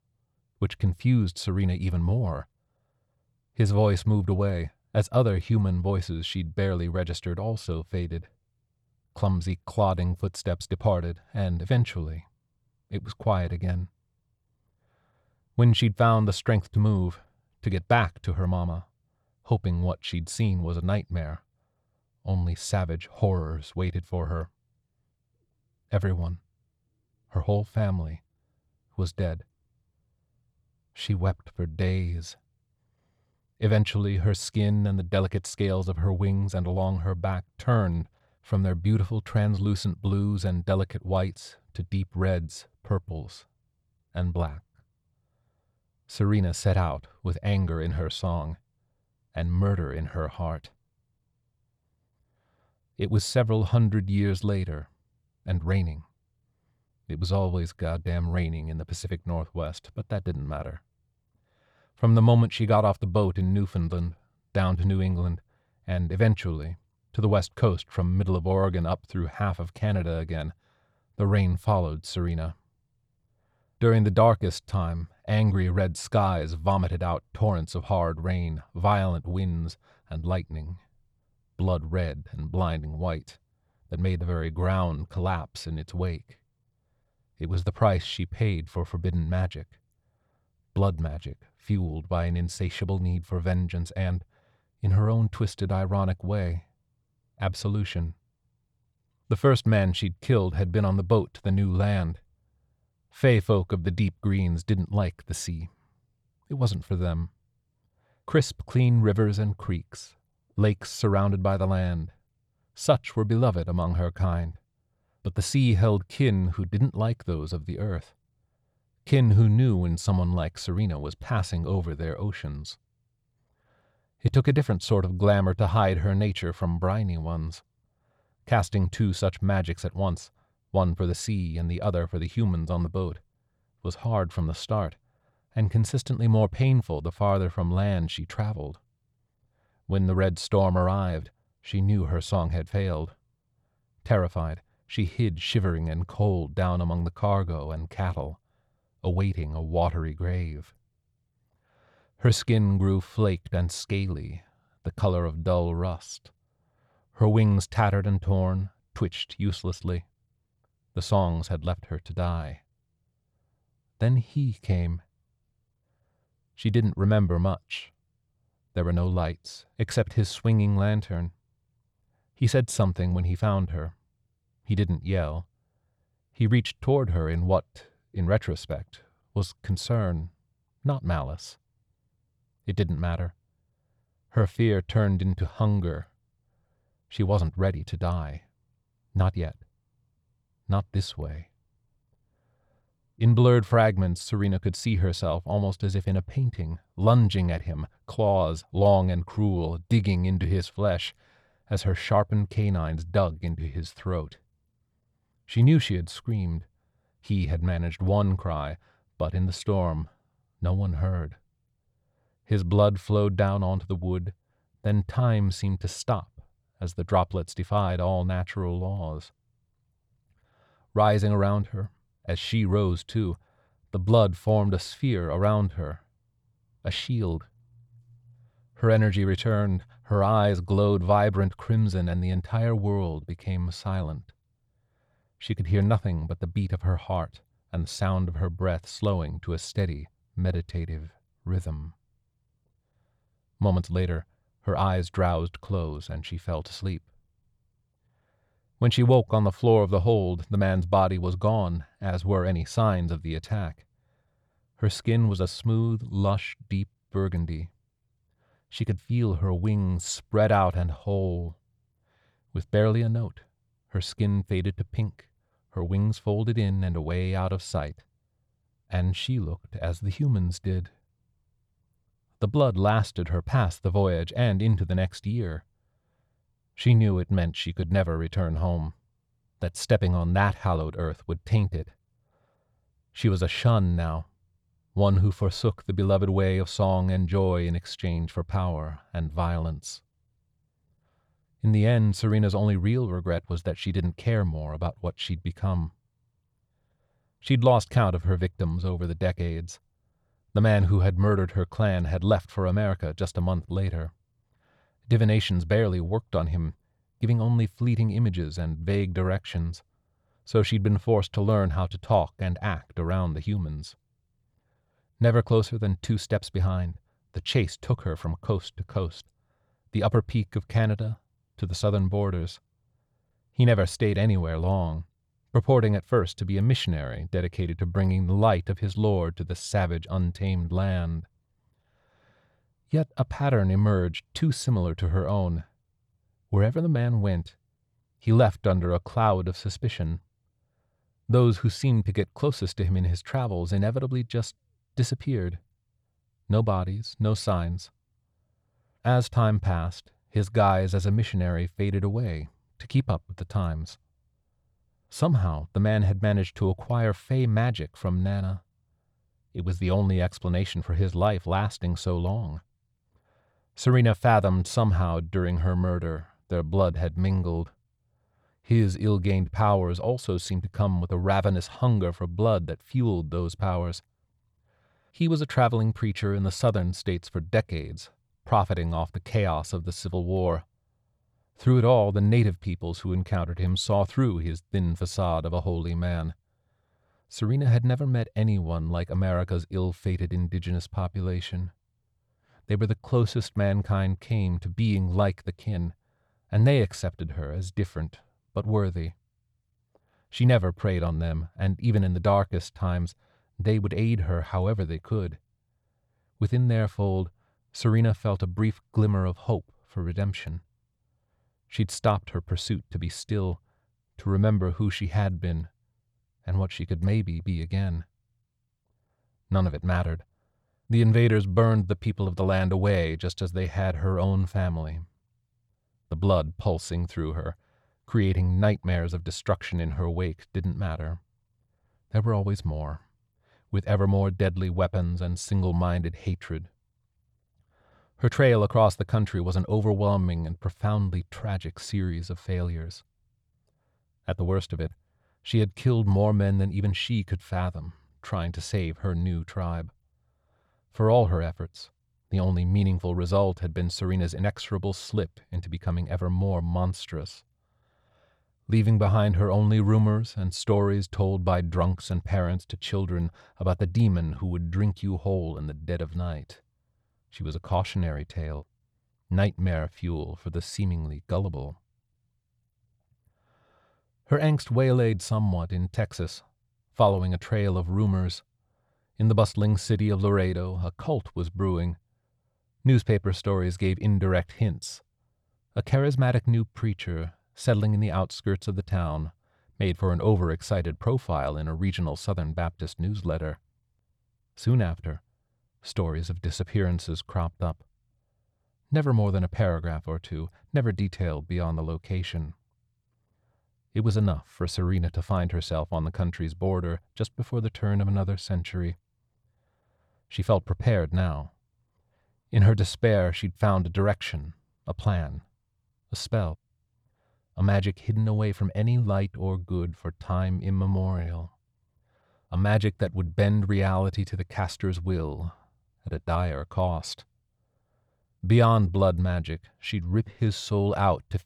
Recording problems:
none

